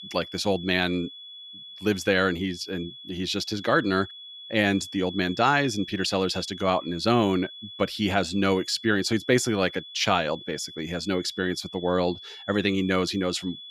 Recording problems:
high-pitched whine; noticeable; throughout; 3.5 kHz, 15 dB below the speech

